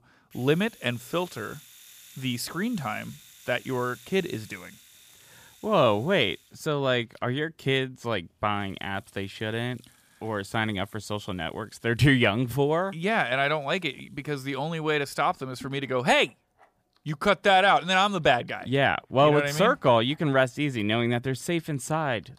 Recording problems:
household noises; faint; throughout; 25 dB below the speech

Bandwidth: 15 kHz